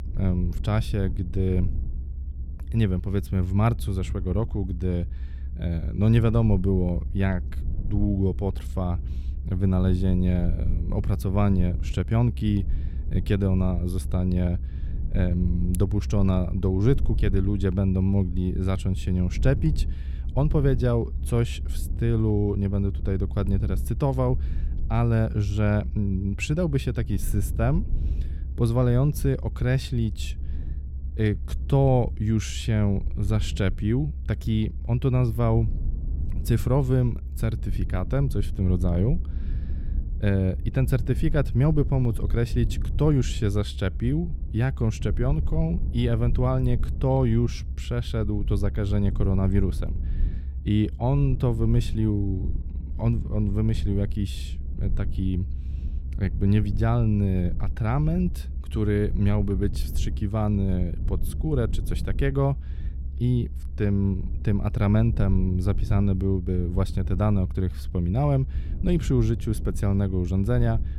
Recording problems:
low rumble; noticeable; throughout; 15 dB below the speech

